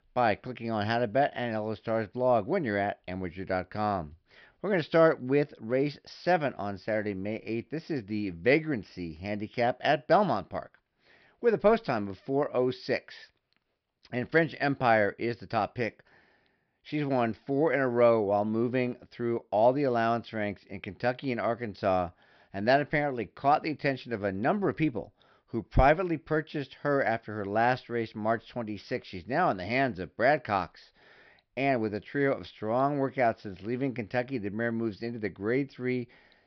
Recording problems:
high frequencies cut off; noticeable; nothing above 5.5 kHz

